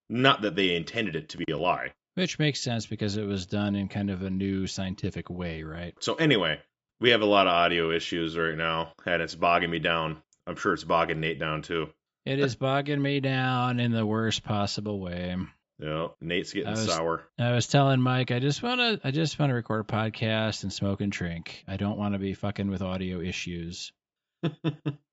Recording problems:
high frequencies cut off; noticeable; nothing above 8 kHz

